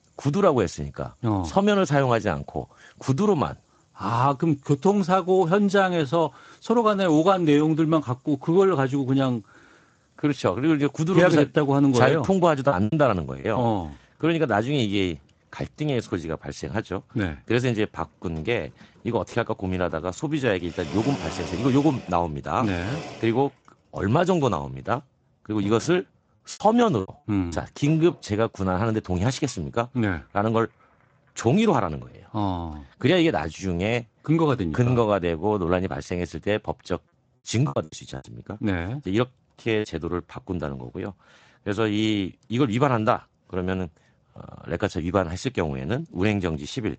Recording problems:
garbled, watery; slightly; nothing above 7.5 kHz
household noises; noticeable; until 33 s; 15 dB below the speech
choppy; very; at 13 s, from 27 to 28 s and from 38 to 40 s; 10% of the speech affected

